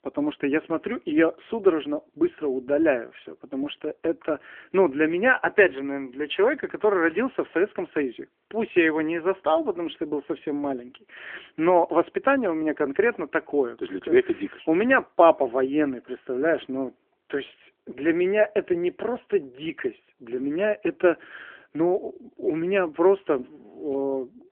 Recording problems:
phone-call audio; nothing above 3 kHz

